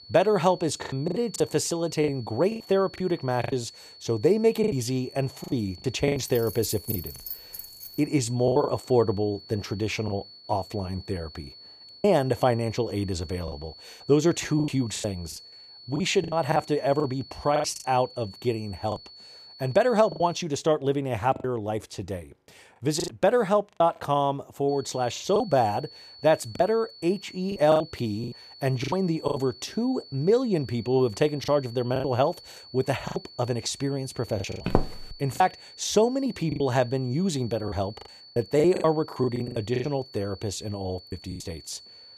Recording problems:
high-pitched whine; noticeable; until 20 s and from 25 s on; 4.5 kHz, 20 dB below the speech
choppy; very; 10% of the speech affected
jangling keys; noticeable; from 6.5 to 8 s; peak 7 dB below the speech
footsteps; noticeable; at 35 s; peak 2 dB below the speech

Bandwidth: 14.5 kHz